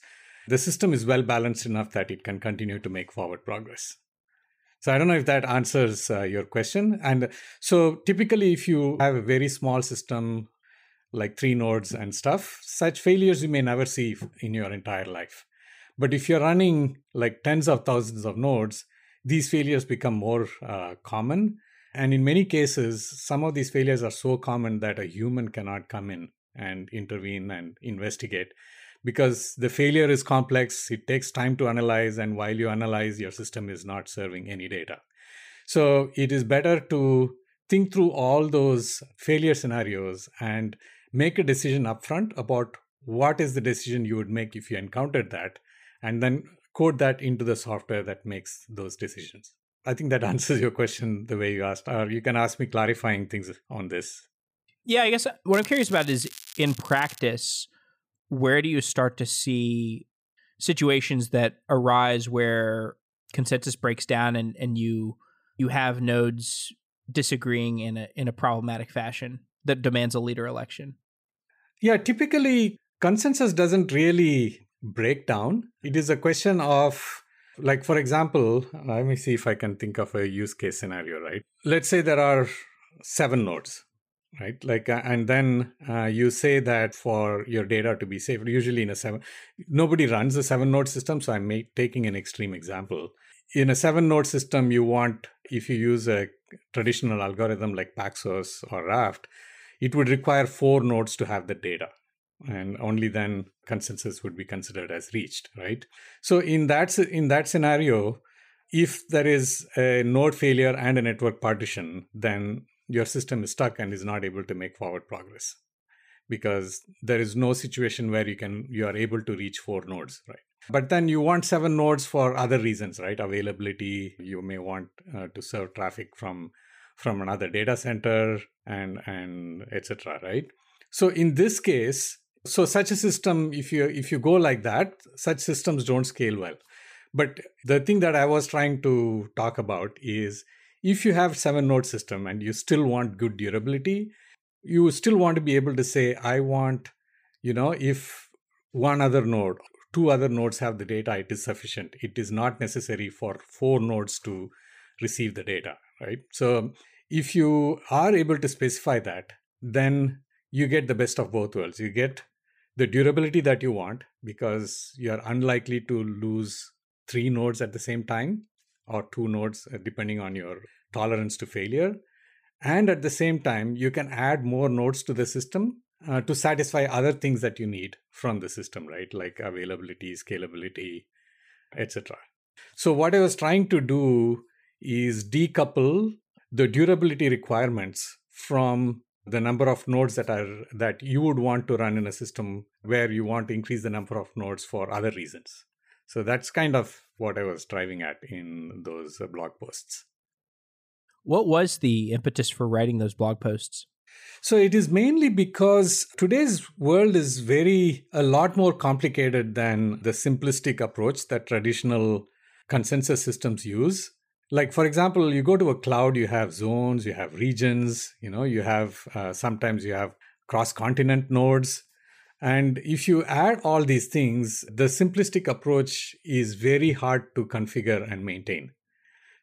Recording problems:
crackling; noticeable; from 56 to 57 s; 15 dB below the speech

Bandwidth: 15 kHz